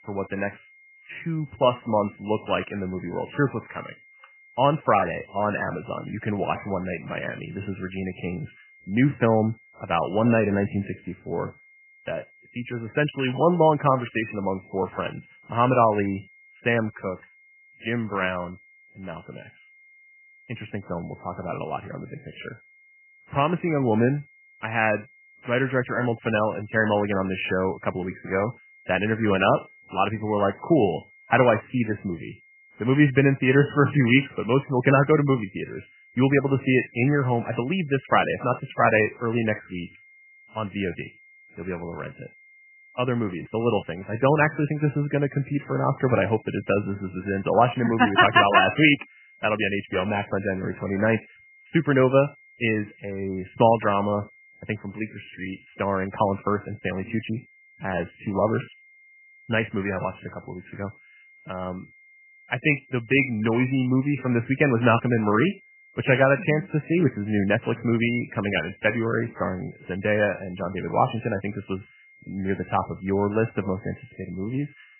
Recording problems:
garbled, watery; badly; nothing above 3 kHz
high-pitched whine; faint; throughout; 2 kHz, 30 dB below the speech

